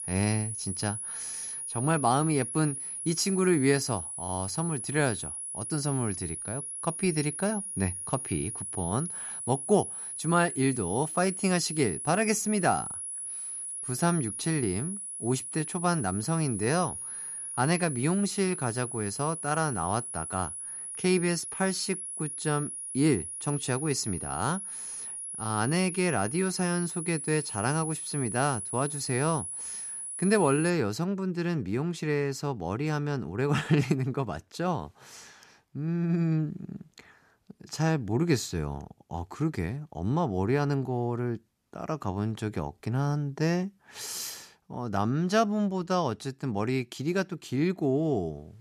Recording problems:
high-pitched whine; loud; until 31 s; 10.5 kHz, 5 dB below the speech

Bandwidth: 14.5 kHz